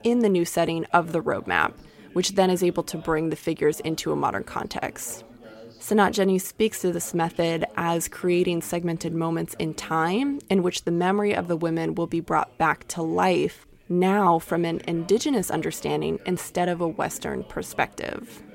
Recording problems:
chatter from many people; faint; throughout; 25 dB below the speech

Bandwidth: 16 kHz